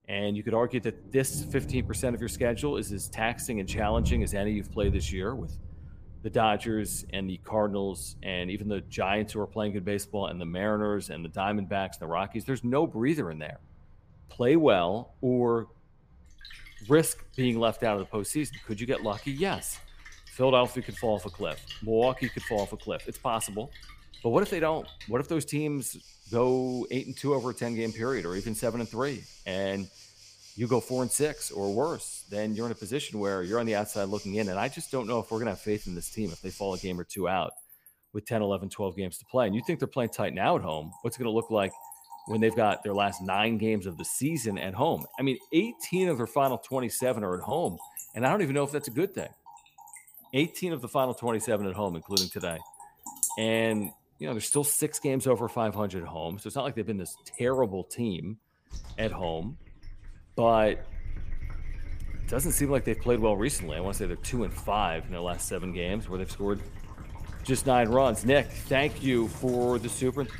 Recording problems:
rain or running water; noticeable; throughout; 10 dB below the speech

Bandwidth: 15 kHz